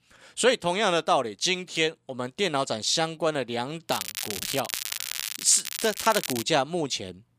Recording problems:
crackling; loud; from 4 to 6.5 s; 6 dB below the speech

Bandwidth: 15 kHz